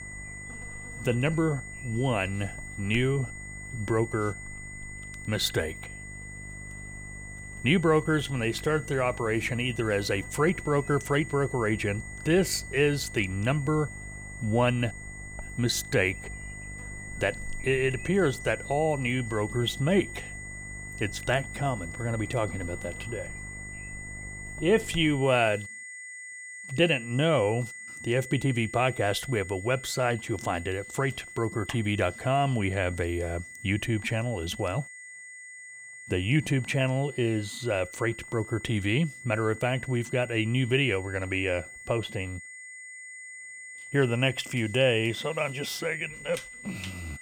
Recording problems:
high-pitched whine; noticeable; throughout; 2 kHz, 15 dB below the speech
electrical hum; faint; until 25 s; 50 Hz, 25 dB below the speech

